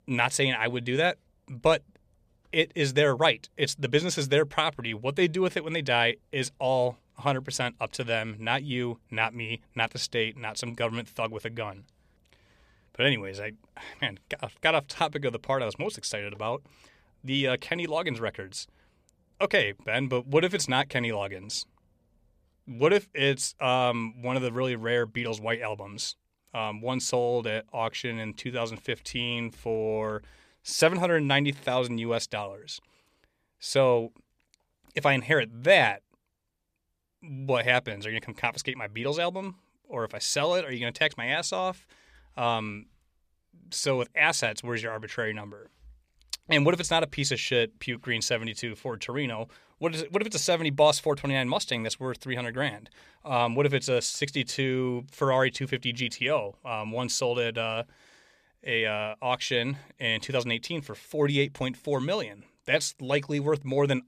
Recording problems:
none

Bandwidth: 14.5 kHz